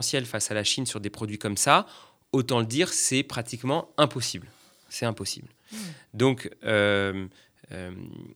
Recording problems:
abrupt cut into speech; at the start

